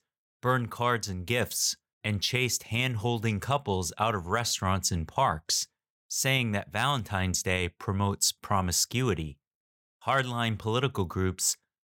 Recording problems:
none

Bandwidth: 16.5 kHz